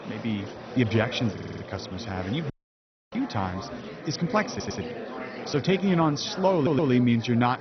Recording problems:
garbled, watery; badly; nothing above 6 kHz
murmuring crowd; noticeable; throughout; 10 dB below the speech
audio stuttering; at 1.5 s, at 4.5 s and at 6.5 s
audio cutting out; at 2.5 s for 0.5 s

